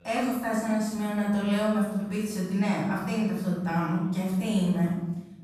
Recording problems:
room echo; strong; dies away in 0.9 s
off-mic speech; far
voice in the background; faint; throughout; 25 dB below the speech

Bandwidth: 14.5 kHz